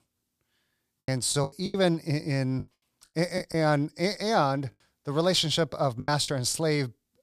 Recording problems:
choppy; very; 10% of the speech affected

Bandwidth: 15 kHz